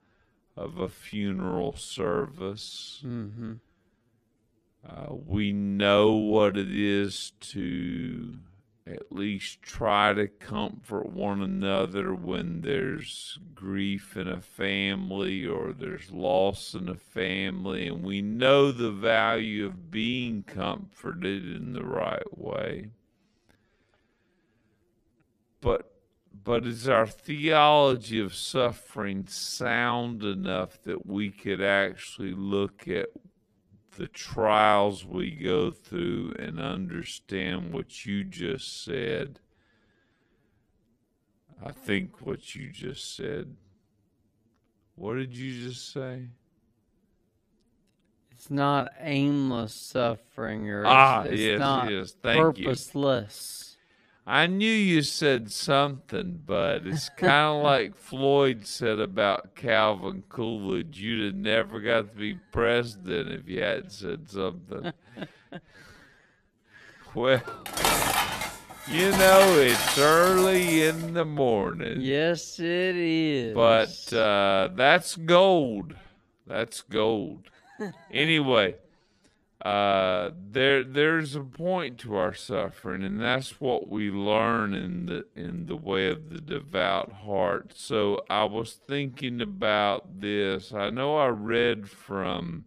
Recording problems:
wrong speed, natural pitch; too slow; 0.5 times normal speed
clattering dishes; loud; from 1:07 to 1:11; peak 4 dB above the speech

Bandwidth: 14.5 kHz